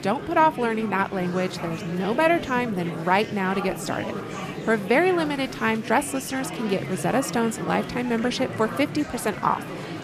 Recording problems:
chatter from many people; loud; throughout; 9 dB below the speech

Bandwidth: 14.5 kHz